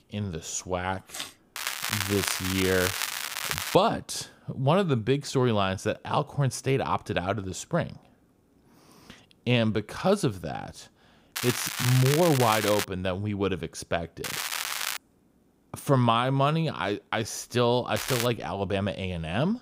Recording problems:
crackling; loud; 4 times, first at 1.5 s; 3 dB below the speech

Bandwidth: 15.5 kHz